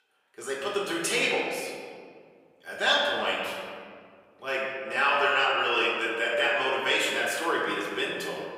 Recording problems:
off-mic speech; far
thin; very; fading below 550 Hz
room echo; noticeable; dies away in 2 s

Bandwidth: 15.5 kHz